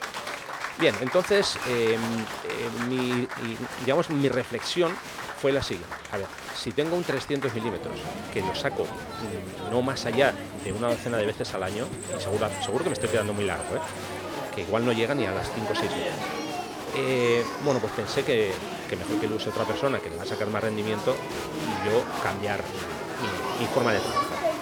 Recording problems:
crowd noise; loud; throughout; 5 dB below the speech

